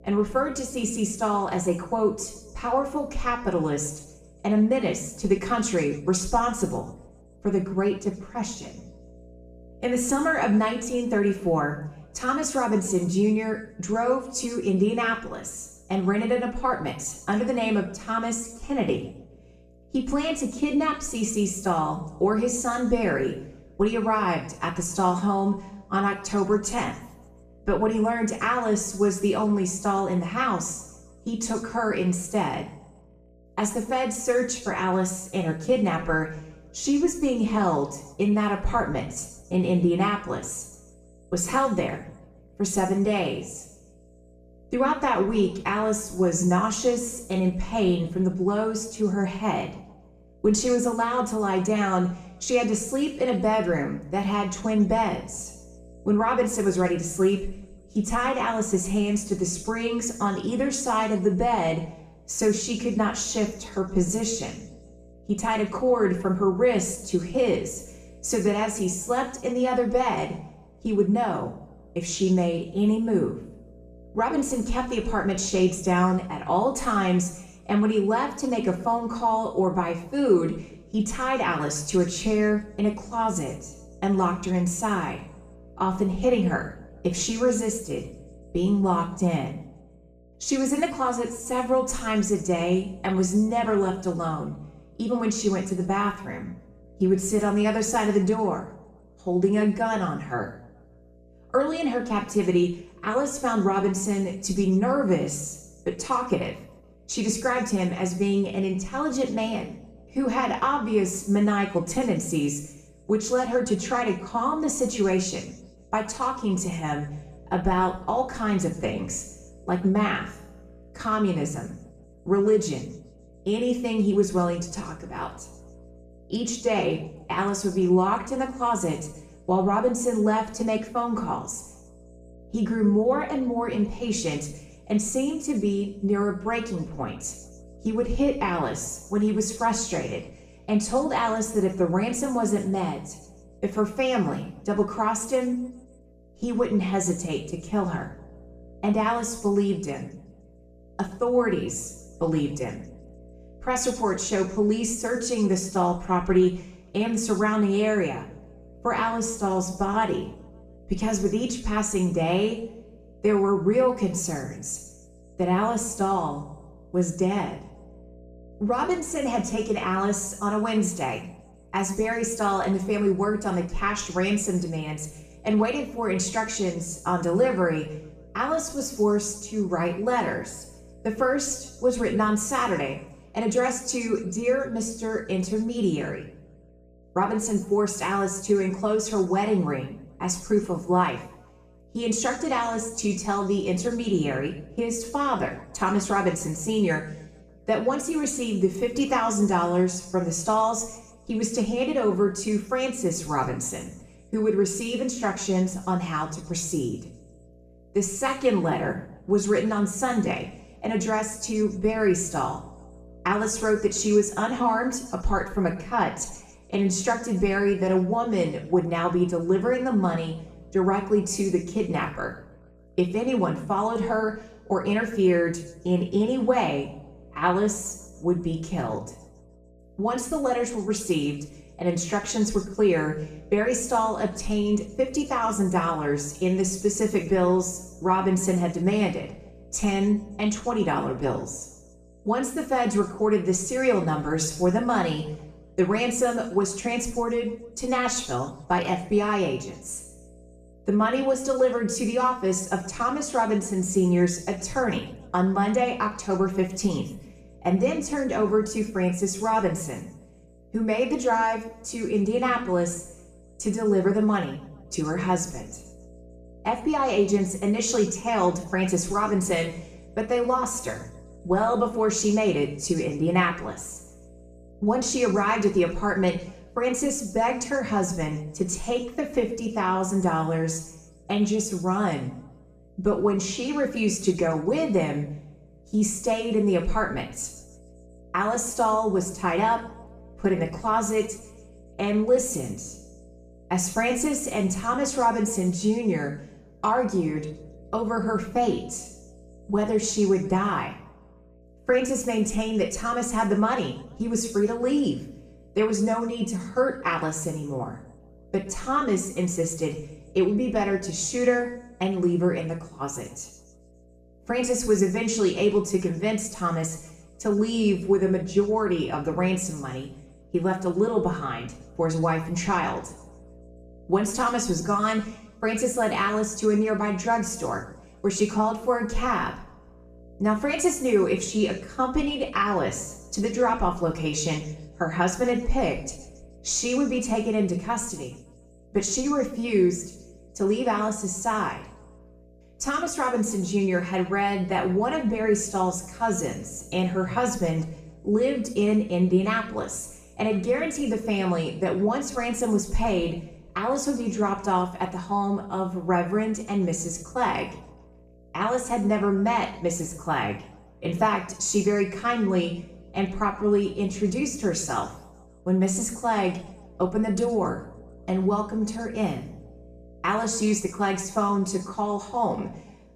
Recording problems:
off-mic speech; far
room echo; noticeable; dies away in 0.7 s
electrical hum; faint; throughout; 60 Hz, 30 dB below the speech

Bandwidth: 14.5 kHz